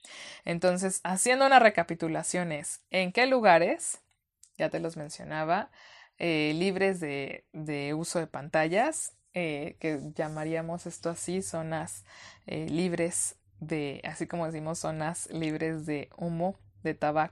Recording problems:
none

